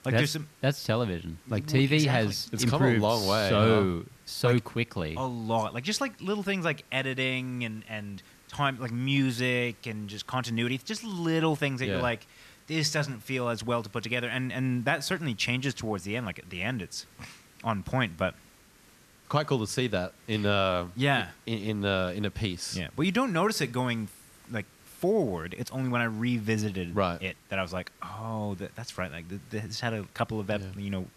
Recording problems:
hiss; faint; throughout; 25 dB below the speech

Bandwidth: 14 kHz